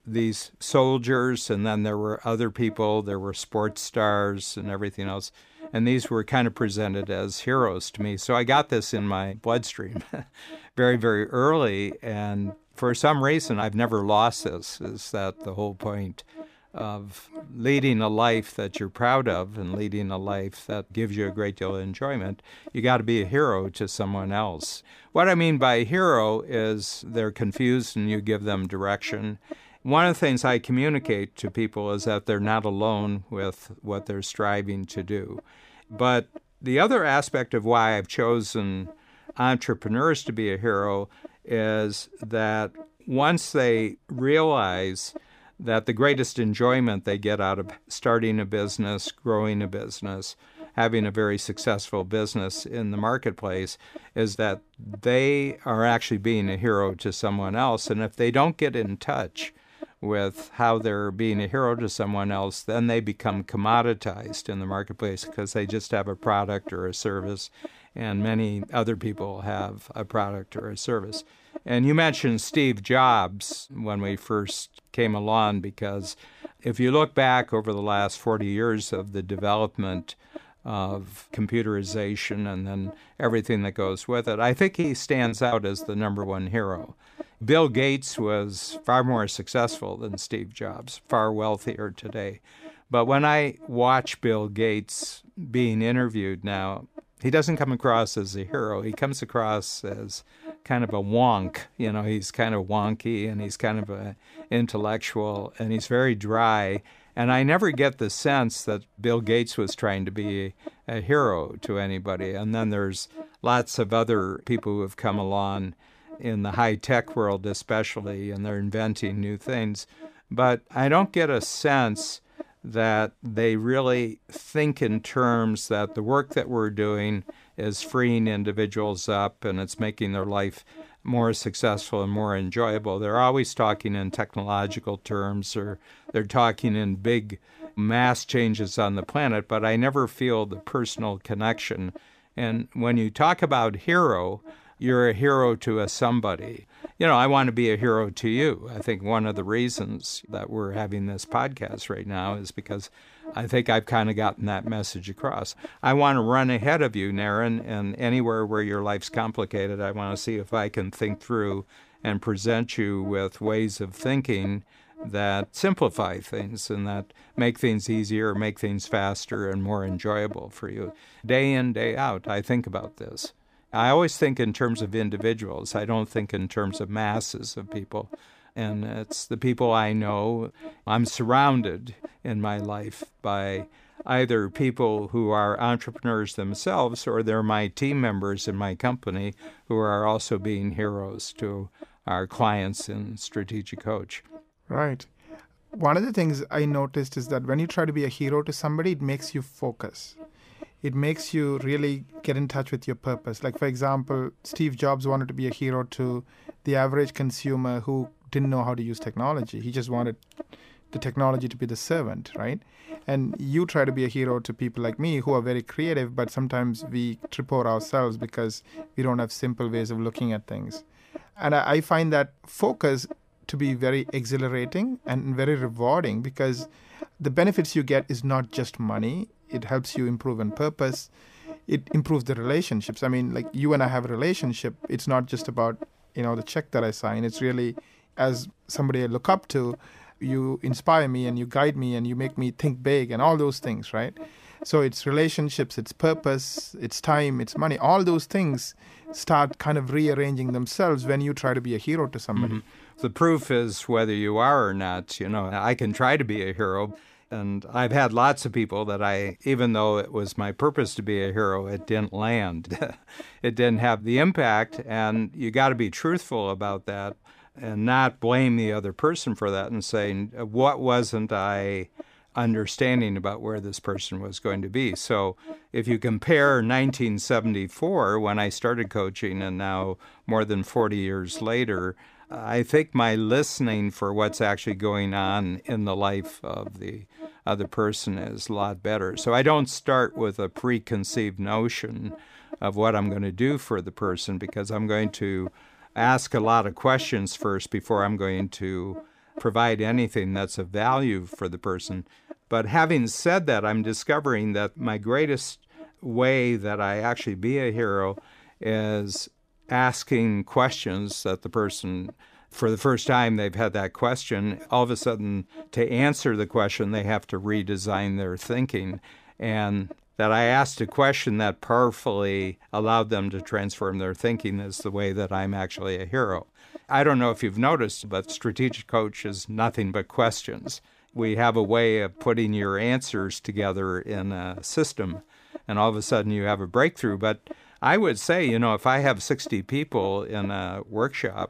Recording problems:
electrical hum; faint; throughout; 60 Hz, 20 dB below the speech
choppy; very; at 1:25; 6% of the speech affected

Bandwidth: 15 kHz